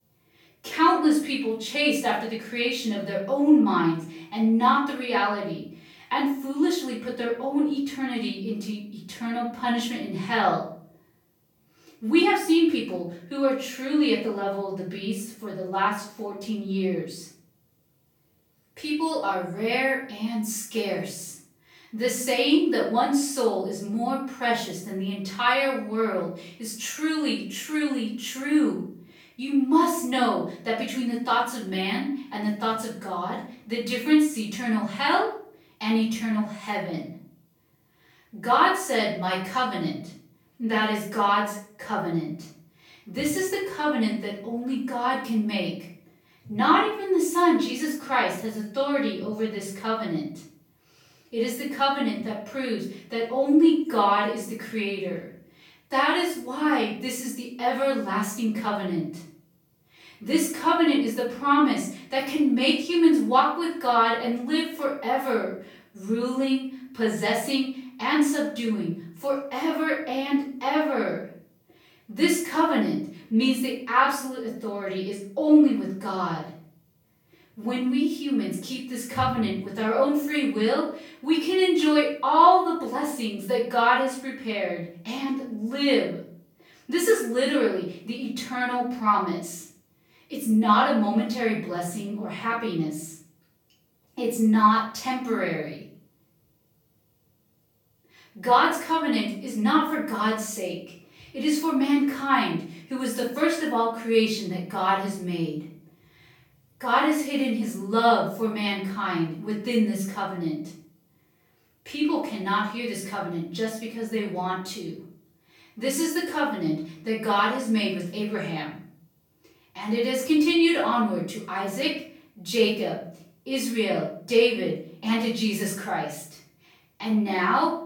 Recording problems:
off-mic speech; far
room echo; noticeable; dies away in 0.5 s

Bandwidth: 17 kHz